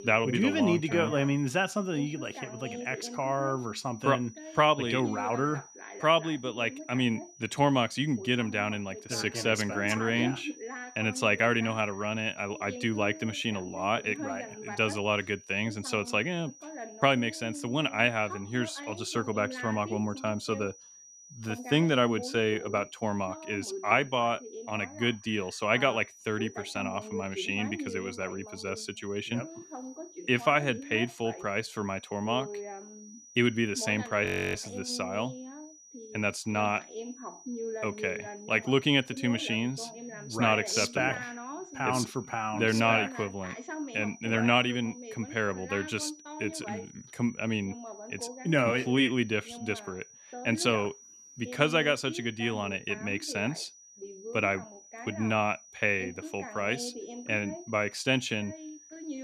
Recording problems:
voice in the background; noticeable; throughout; 15 dB below the speech
high-pitched whine; faint; throughout; 6 kHz, 20 dB below the speech
audio freezing; at 34 s

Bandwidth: 14.5 kHz